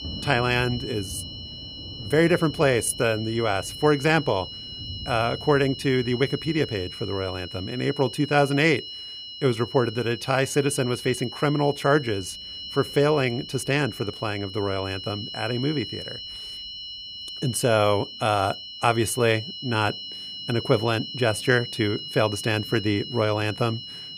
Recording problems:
high-pitched whine; noticeable; throughout; 3 kHz, 10 dB below the speech
rain or running water; faint; throughout; 20 dB below the speech

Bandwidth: 15 kHz